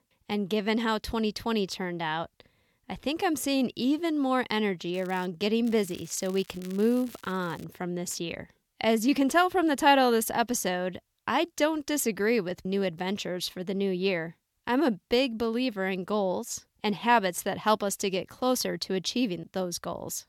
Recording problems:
crackling; faint; at 5 s and from 5.5 to 7.5 s; 25 dB below the speech

